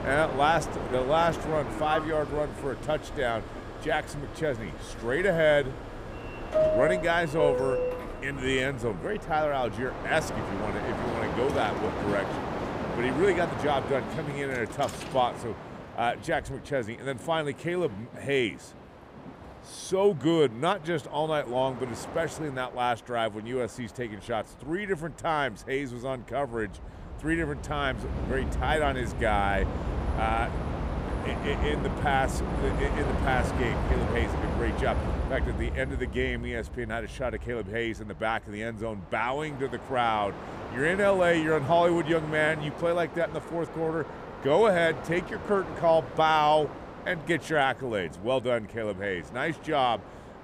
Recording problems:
train or aircraft noise; loud; throughout; 6 dB below the speech

